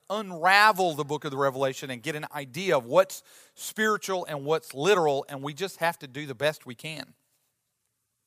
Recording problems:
none

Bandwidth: 15 kHz